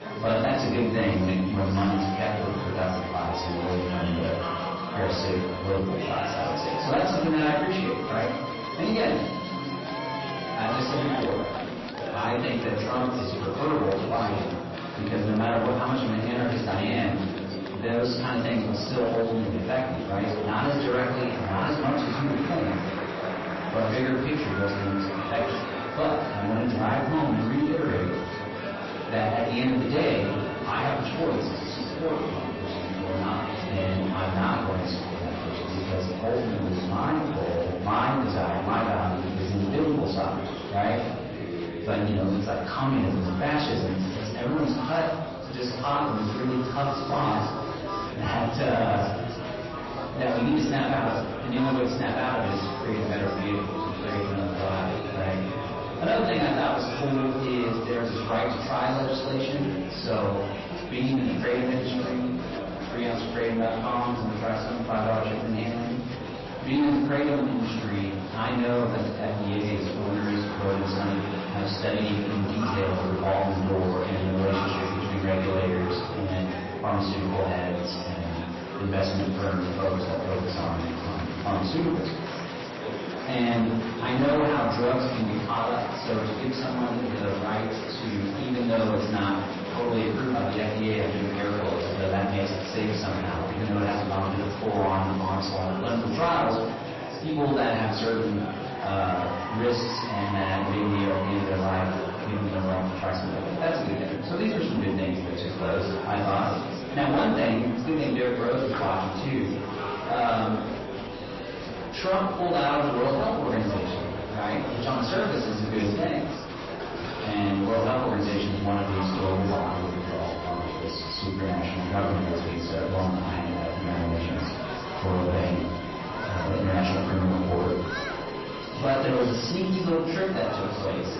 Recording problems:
off-mic speech; far
room echo; noticeable; dies away in 0.7 s
distortion; slight; 10 dB below the speech
garbled, watery; slightly; nothing above 5.5 kHz
murmuring crowd; loud; throughout; 6 dB below the speech
background music; noticeable; throughout; 15 dB below the speech

